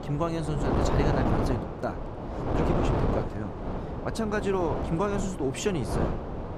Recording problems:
wind noise on the microphone; heavy; as loud as the speech

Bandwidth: 14.5 kHz